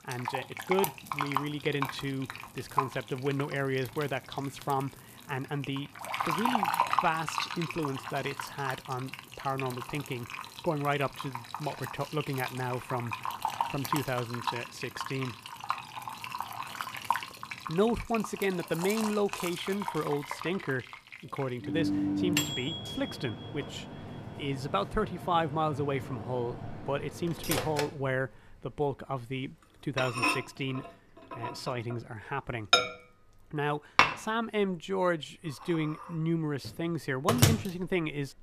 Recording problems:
household noises; loud; throughout; 1 dB below the speech

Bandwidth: 14.5 kHz